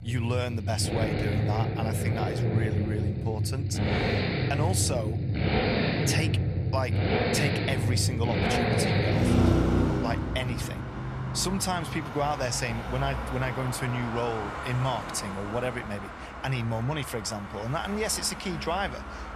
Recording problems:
traffic noise; very loud; throughout; 3 dB above the speech

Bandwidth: 14 kHz